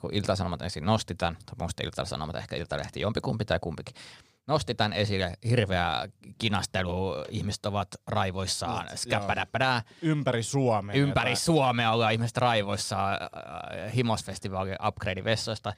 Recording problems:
none

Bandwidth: 15 kHz